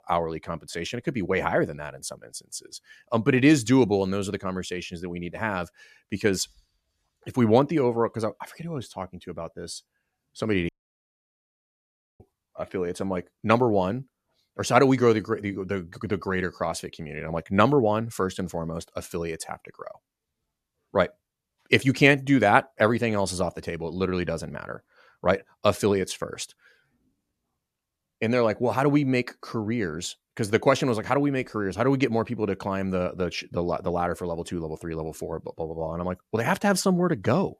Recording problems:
audio cutting out; at 11 s for 1.5 s

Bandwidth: 14 kHz